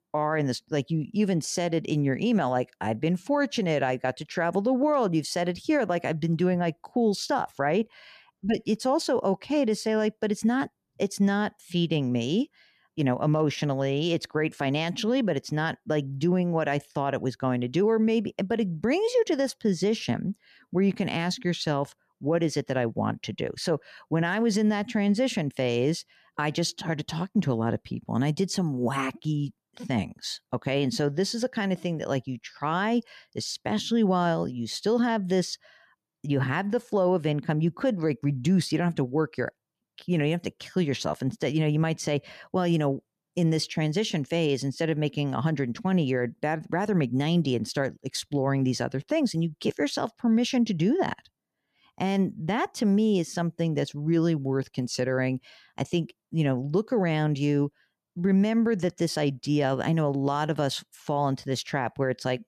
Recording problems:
none

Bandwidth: 14.5 kHz